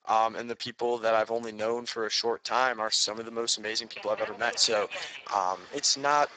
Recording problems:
garbled, watery; badly; nothing above 8 kHz
thin; very; fading below 650 Hz
train or aircraft noise; noticeable; from 3 s on; 15 dB below the speech

